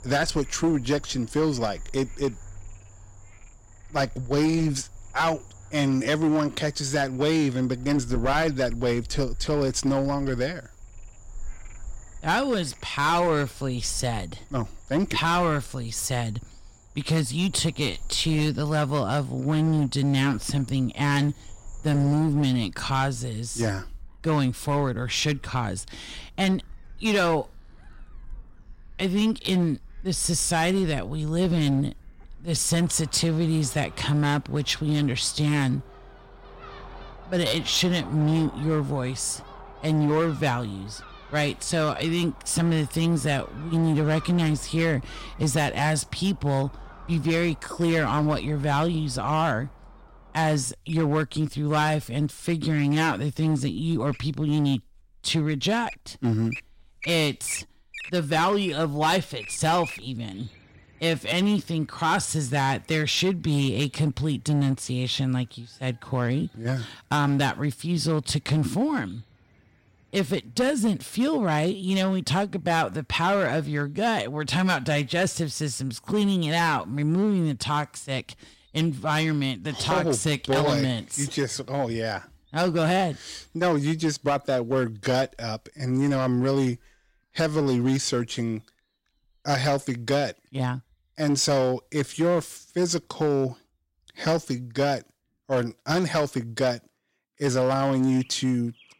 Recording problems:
distortion; slight; 7% of the sound clipped
animal sounds; faint; throughout; 20 dB below the speech

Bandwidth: 16 kHz